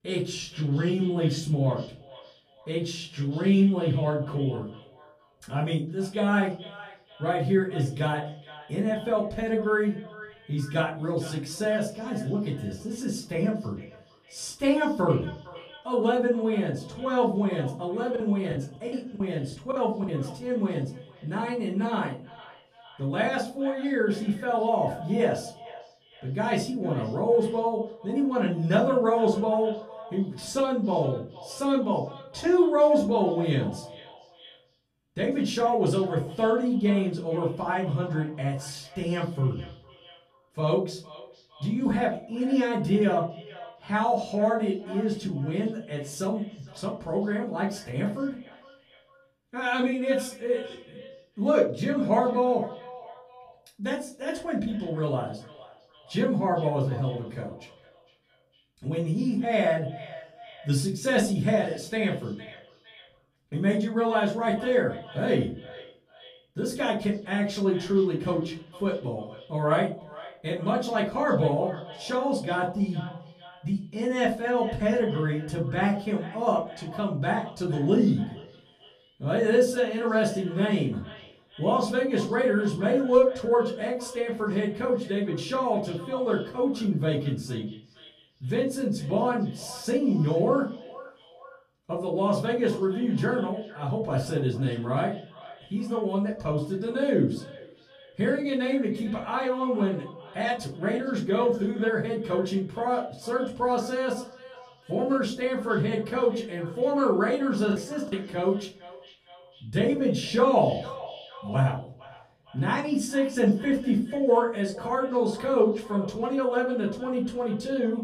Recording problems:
off-mic speech; far
echo of what is said; faint; throughout; 460 ms later, 20 dB below the speech
room echo; slight; dies away in 0.4 s
choppy; very; from 18 to 20 s and at 1:48; 9% of the speech affected

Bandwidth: 14.5 kHz